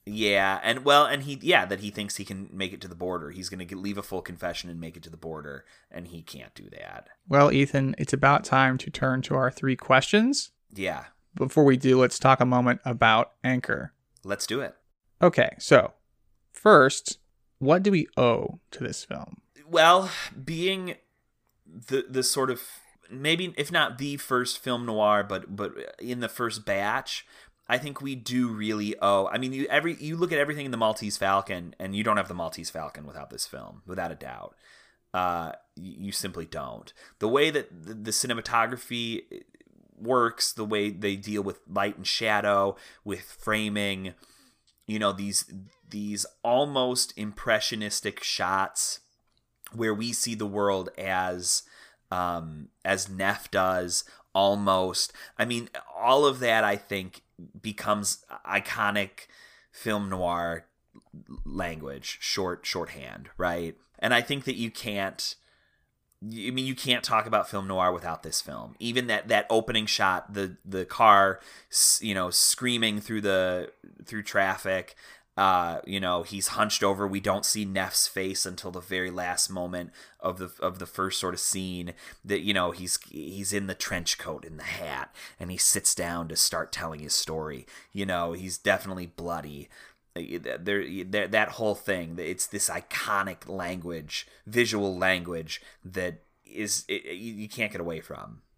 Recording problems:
none

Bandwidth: 15 kHz